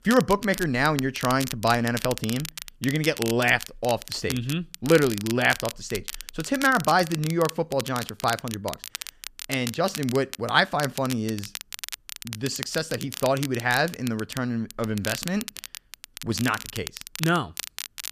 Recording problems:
crackle, like an old record; noticeable; 10 dB below the speech

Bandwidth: 14.5 kHz